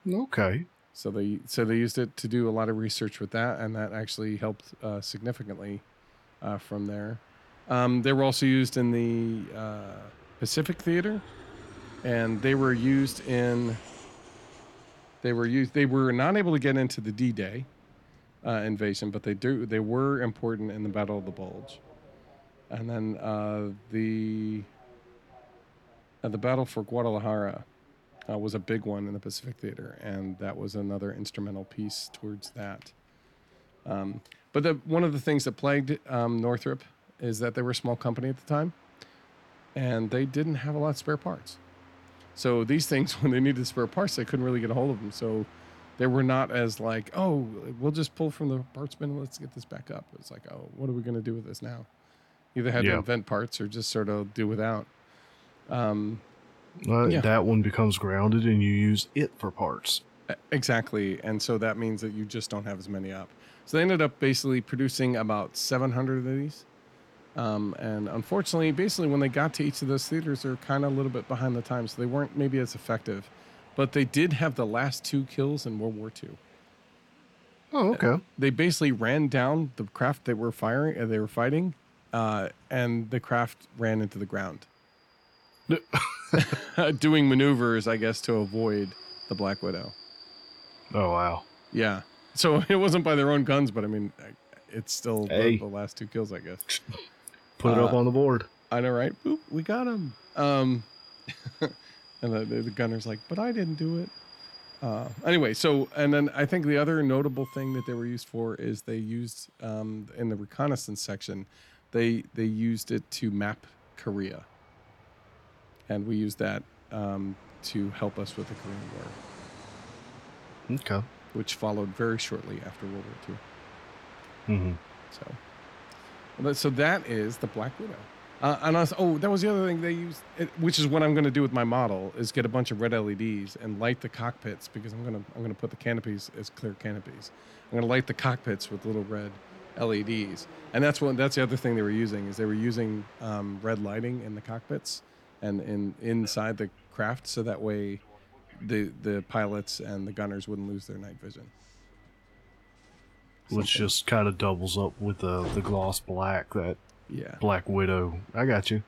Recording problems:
train or aircraft noise; faint; throughout; 25 dB below the speech

